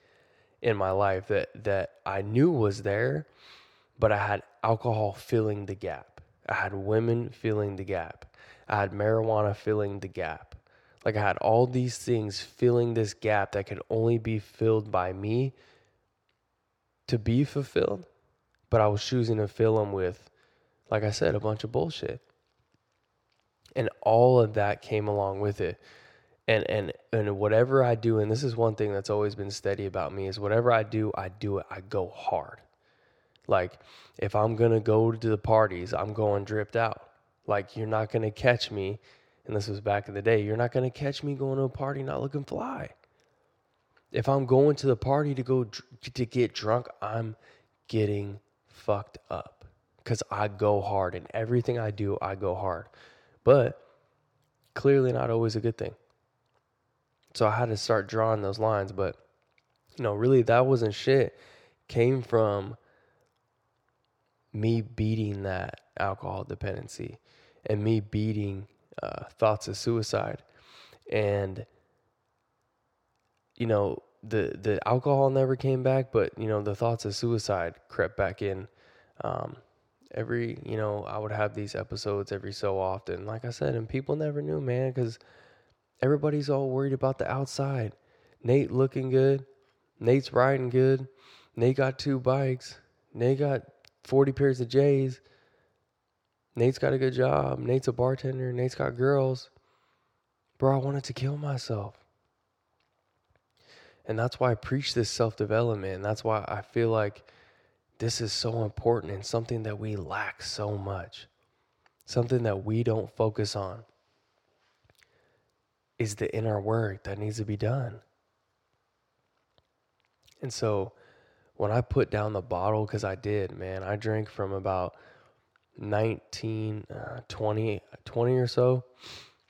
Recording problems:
none

